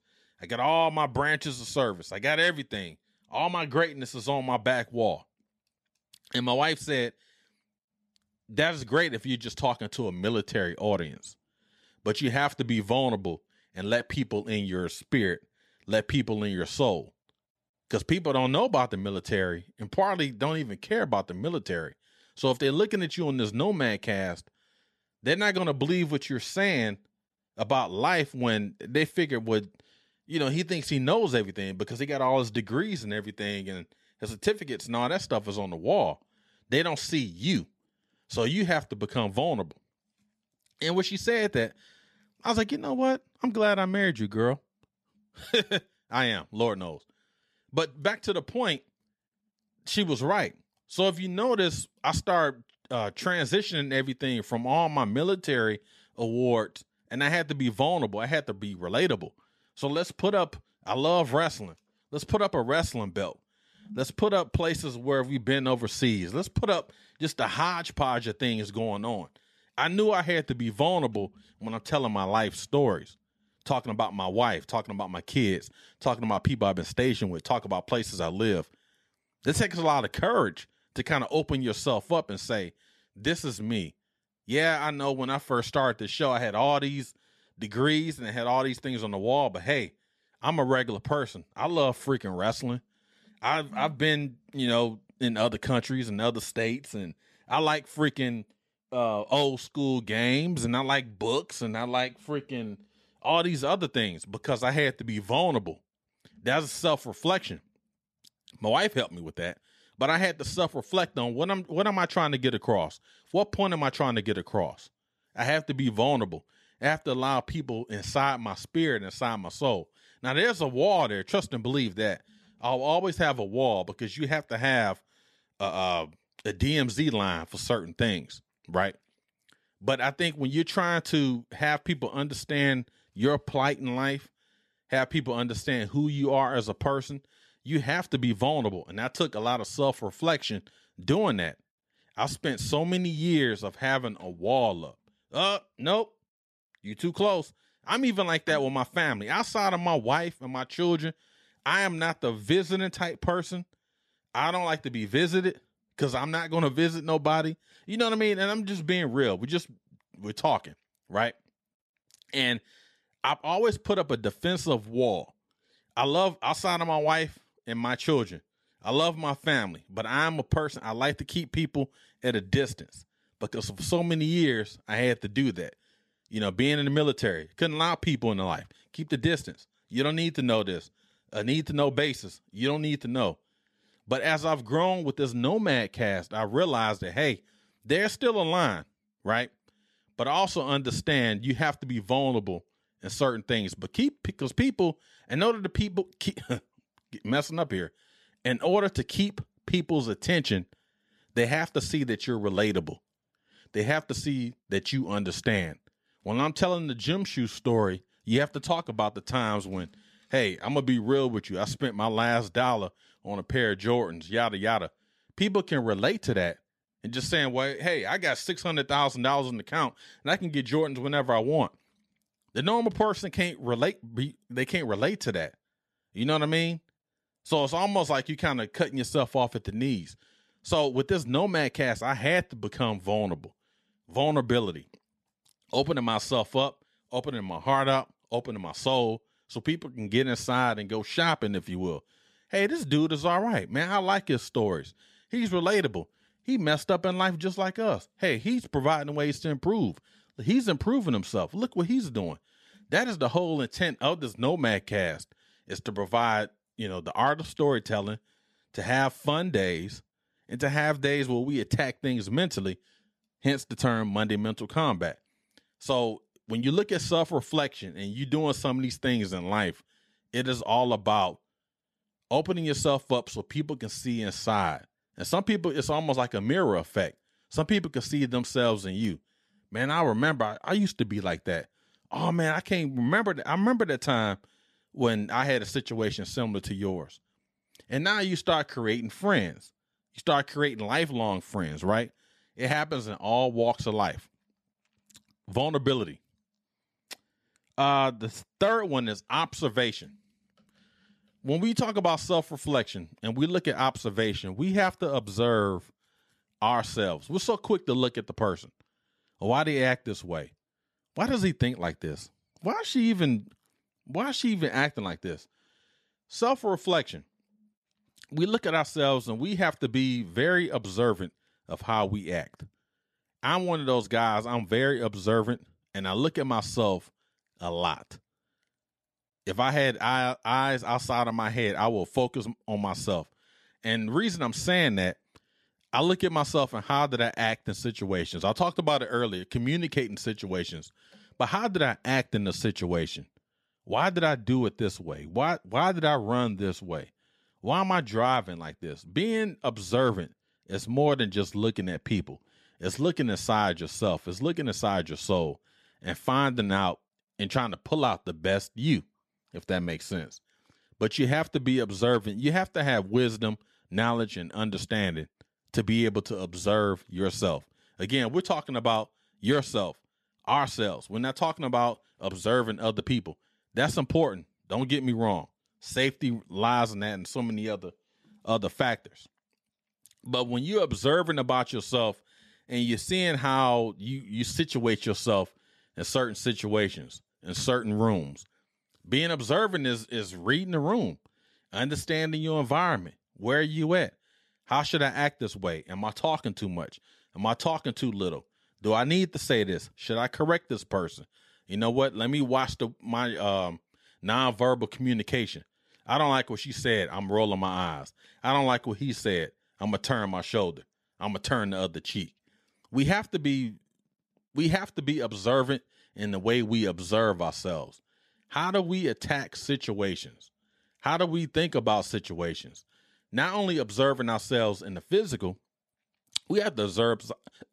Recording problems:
none

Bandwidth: 13.5 kHz